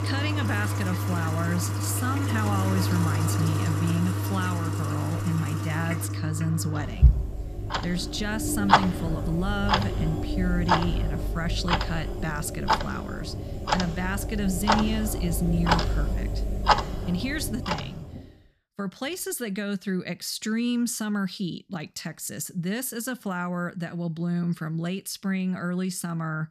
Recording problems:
household noises; very loud; until 18 s; 2 dB above the speech

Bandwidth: 14.5 kHz